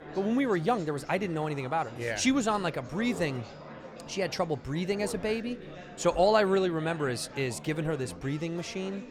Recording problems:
chatter from many people; noticeable; throughout; 15 dB below the speech

